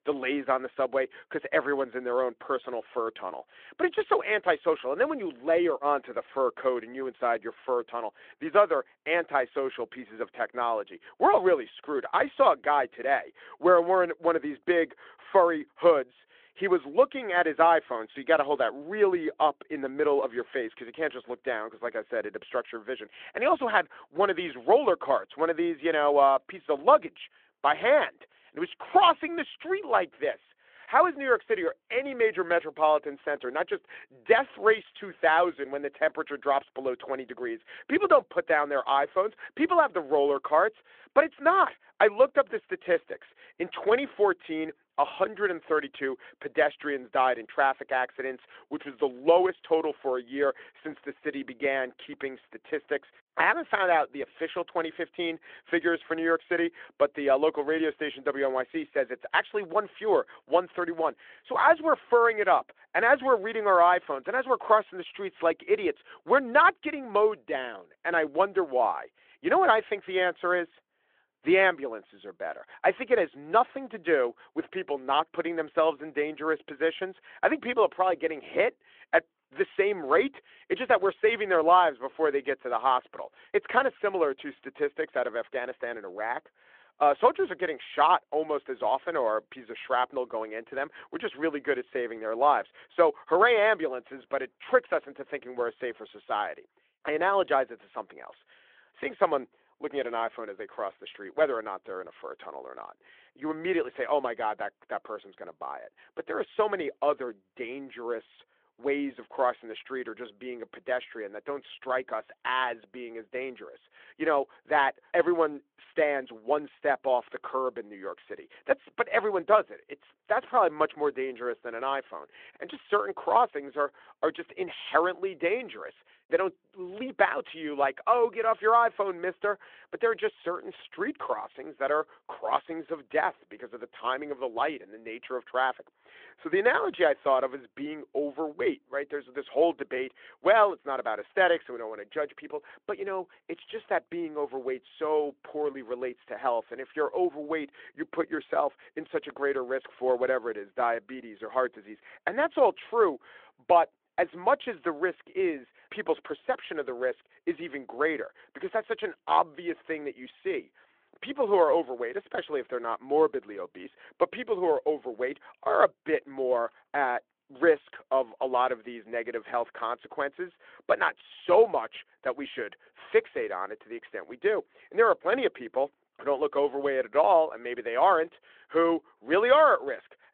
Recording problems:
phone-call audio

